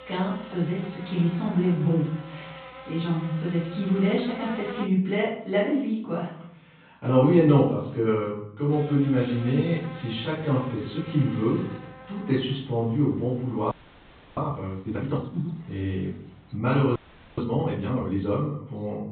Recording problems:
off-mic speech; far
high frequencies cut off; severe; nothing above 4 kHz
room echo; noticeable; dies away in 0.6 s
electrical hum; noticeable; until 5 s and from 8.5 to 17 s; 60 Hz, 10 dB below the speech
audio freezing; at 14 s for 0.5 s and at 17 s

